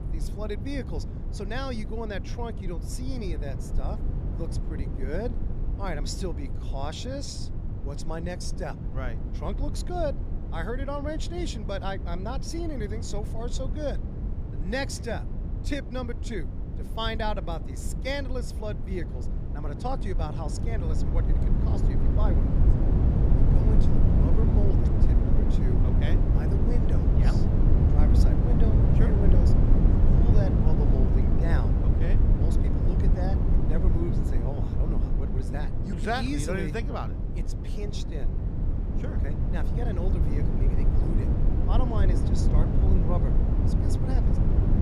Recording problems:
low rumble; loud; throughout; 2 dB below the speech

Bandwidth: 15 kHz